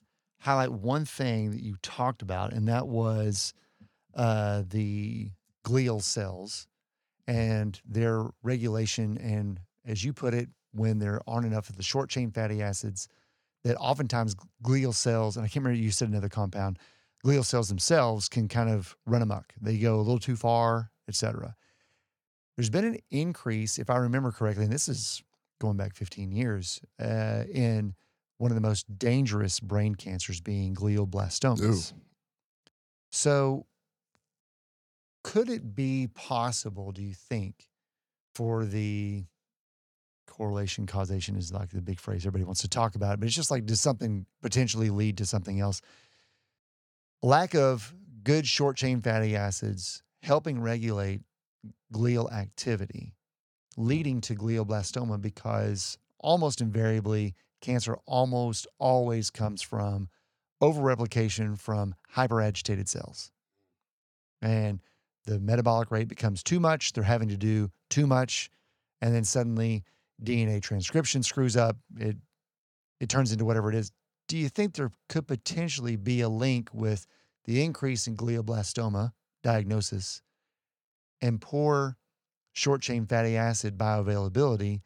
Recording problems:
none

